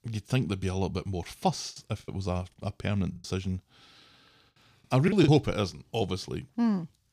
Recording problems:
choppy; very; from 1.5 to 5.5 s; 12% of the speech affected

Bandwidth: 15 kHz